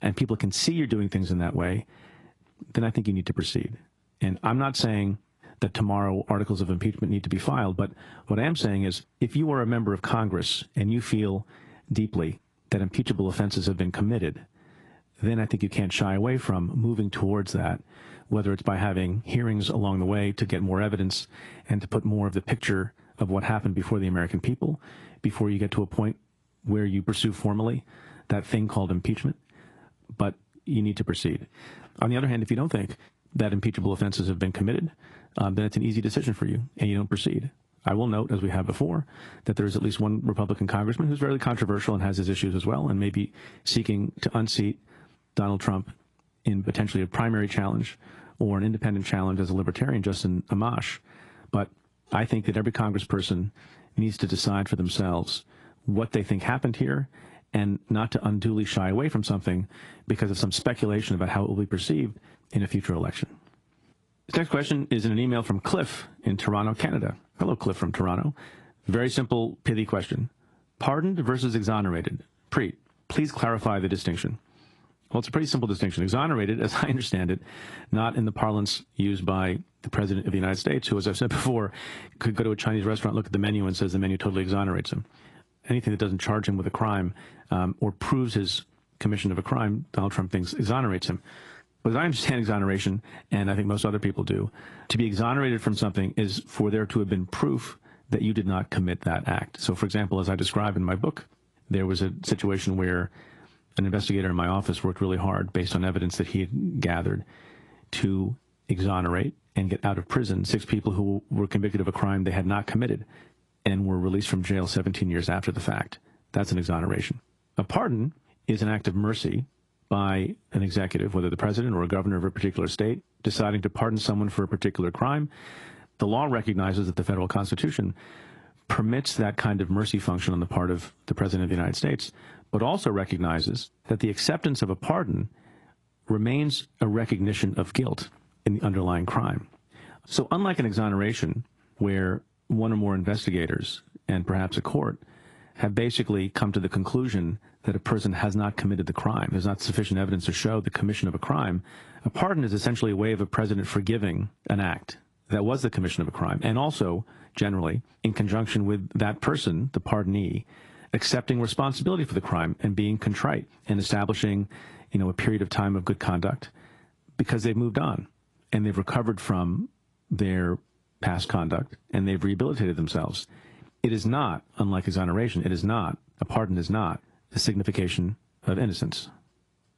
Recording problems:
garbled, watery; slightly; nothing above 11 kHz
squashed, flat; somewhat

